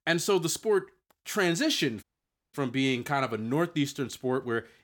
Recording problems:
audio cutting out; at 2 s for 0.5 s

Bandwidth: 17.5 kHz